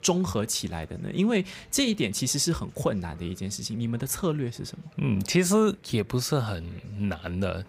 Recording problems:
chatter from many people; faint; throughout; 30 dB below the speech

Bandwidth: 15 kHz